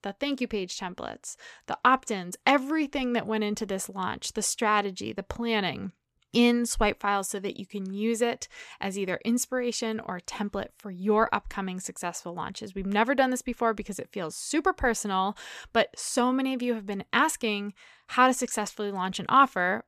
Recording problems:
none

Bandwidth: 14 kHz